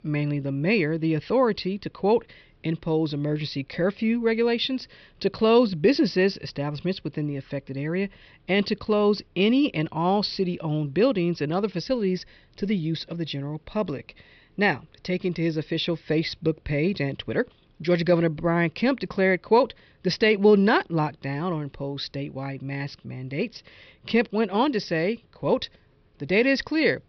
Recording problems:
high frequencies cut off; noticeable; nothing above 5.5 kHz

